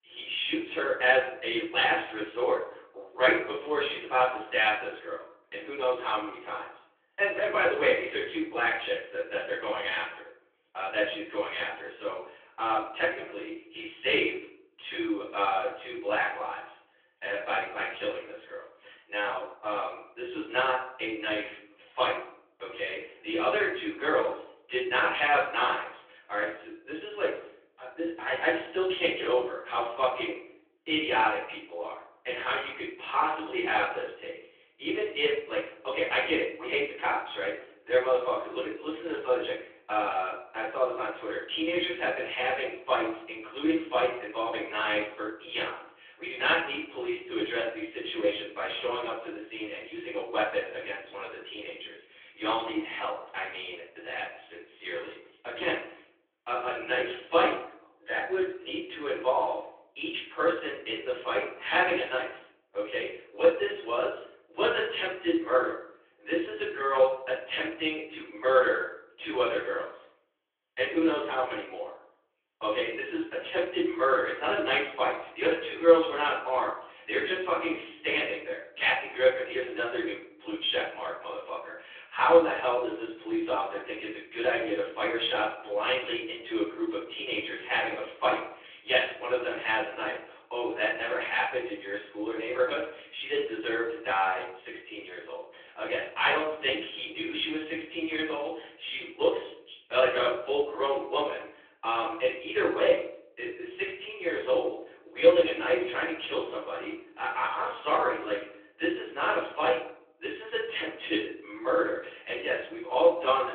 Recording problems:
off-mic speech; far
thin; very; fading below 300 Hz
room echo; noticeable; dies away in 0.7 s
phone-call audio; nothing above 3.5 kHz

